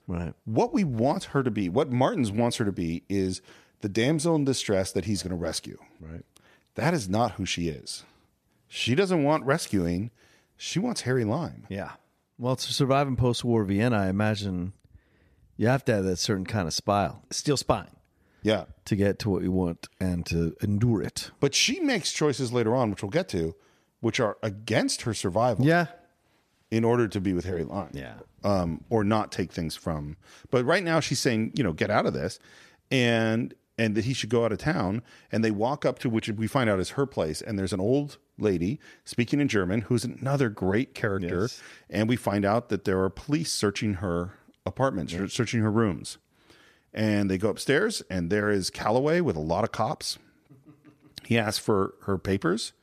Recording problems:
none

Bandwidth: 14.5 kHz